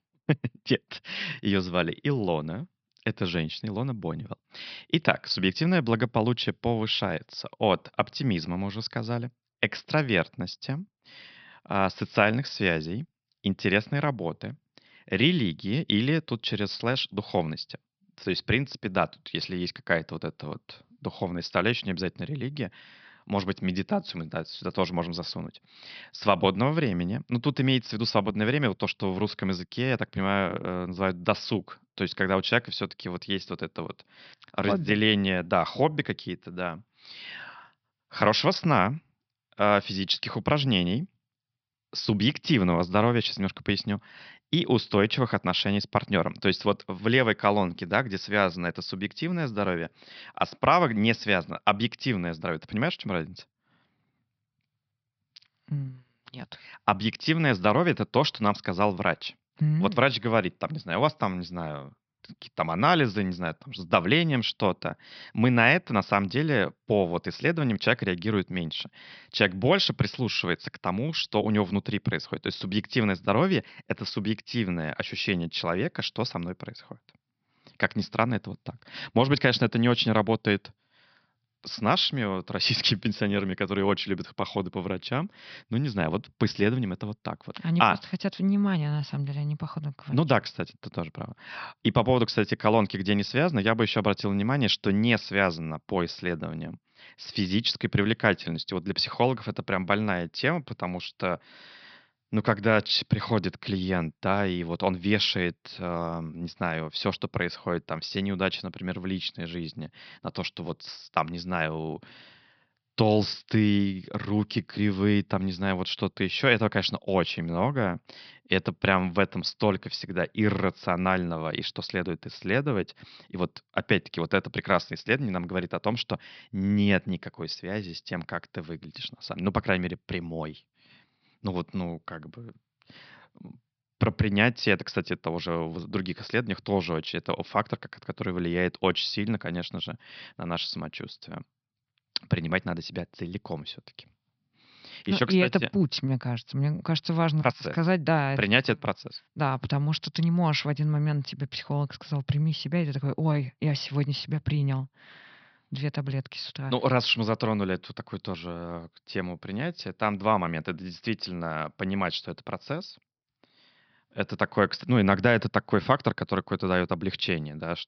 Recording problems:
high frequencies cut off; noticeable; nothing above 5.5 kHz

